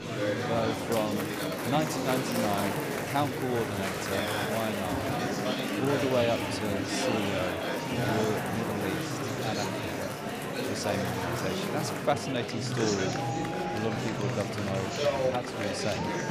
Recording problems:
murmuring crowd; very loud; throughout; 2 dB above the speech

